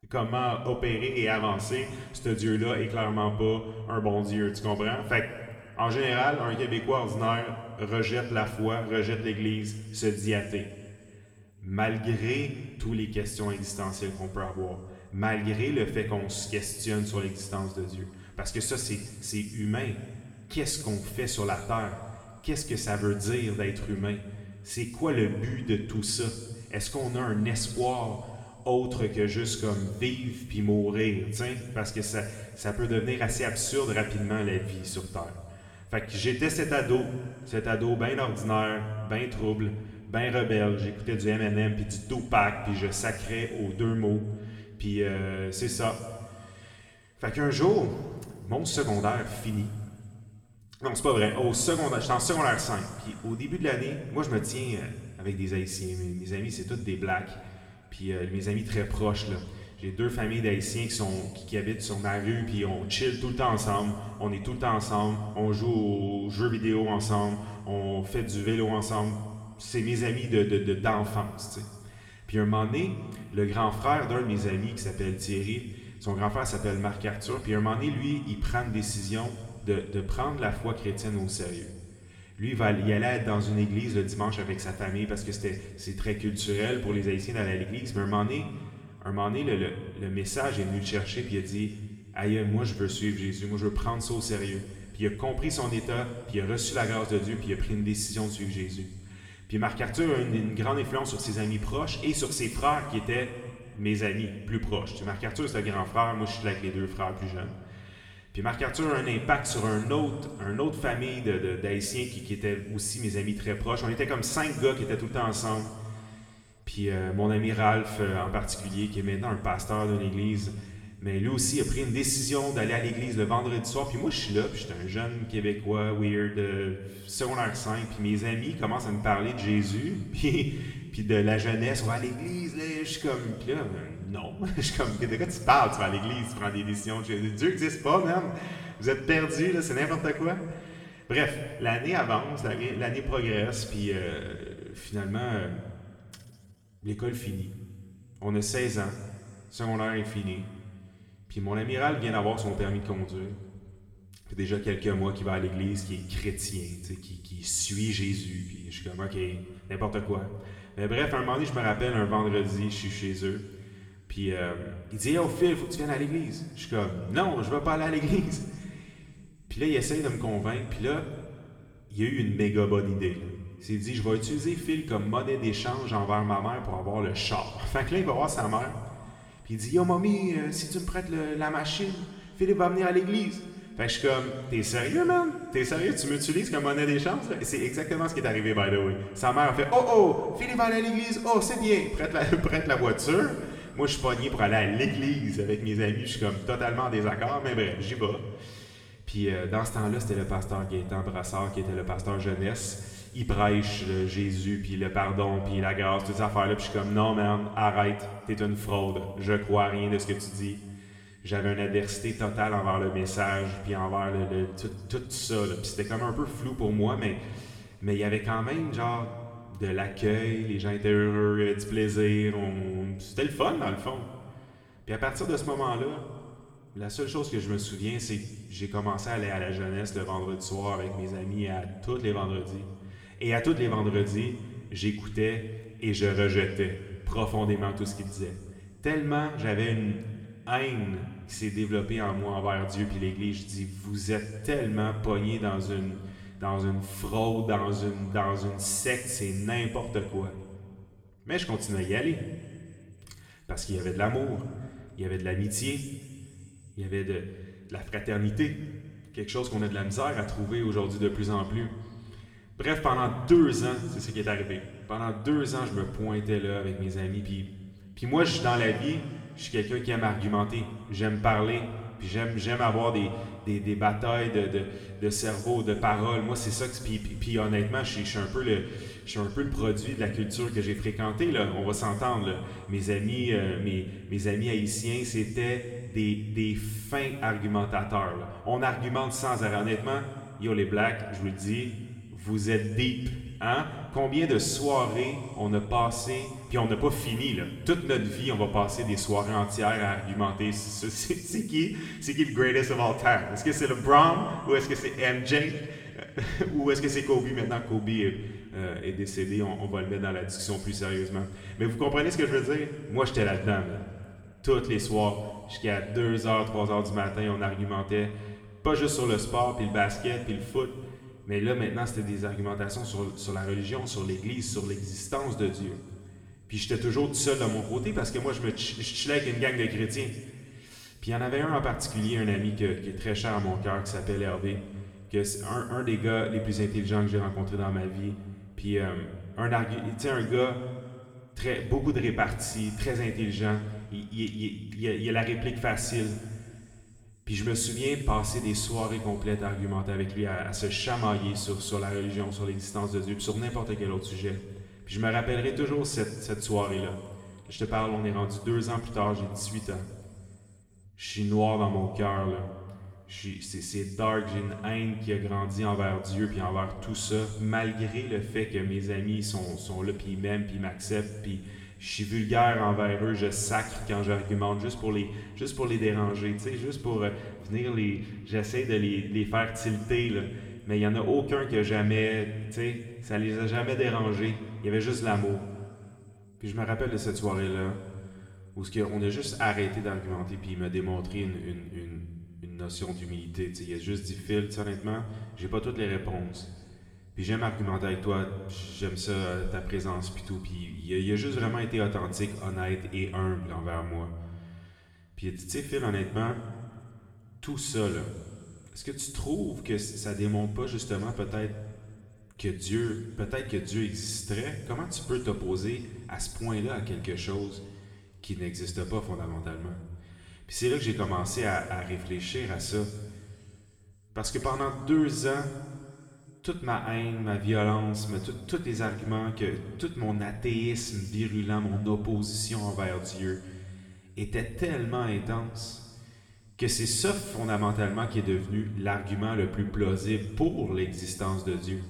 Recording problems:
room echo; noticeable; dies away in 1.8 s
off-mic speech; somewhat distant

